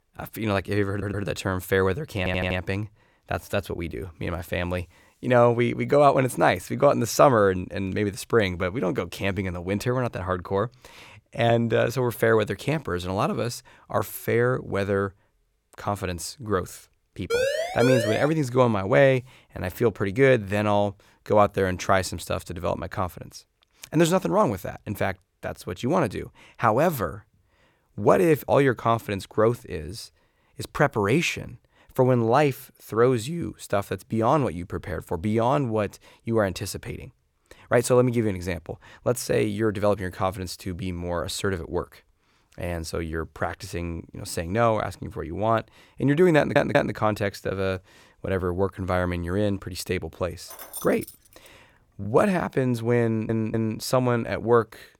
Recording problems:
audio stuttering; 4 times, first at 1 s
siren; noticeable; at 17 s; peak level with the speech
jangling keys; faint; at 51 s; peak 10 dB below the speech

